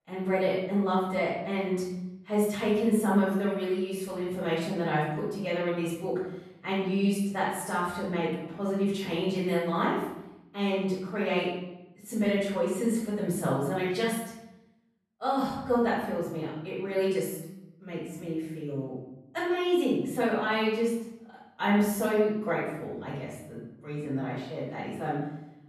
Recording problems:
off-mic speech; far
room echo; noticeable; dies away in 0.8 s

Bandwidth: 13.5 kHz